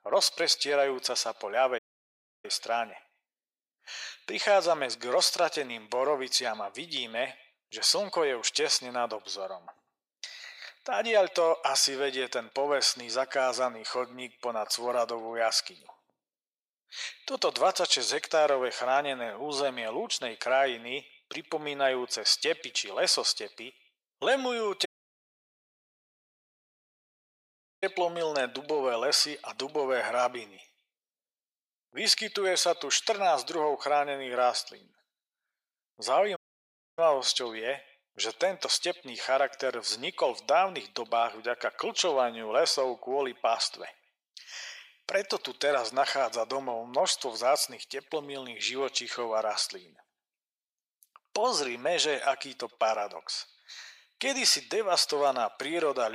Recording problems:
thin; very; fading below 550 Hz
echo of what is said; faint; throughout; 100 ms later, 25 dB below the speech
audio cutting out; at 2 s for 0.5 s, at 25 s for 3 s and at 36 s for 0.5 s
abrupt cut into speech; at the end

